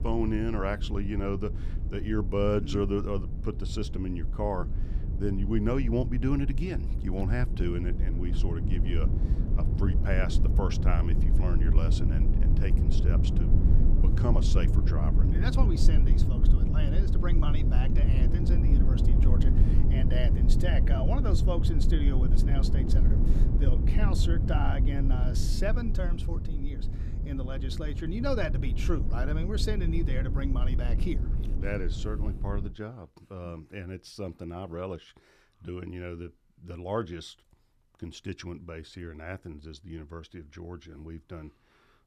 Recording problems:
low rumble; loud; until 33 s; 5 dB below the speech

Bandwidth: 14.5 kHz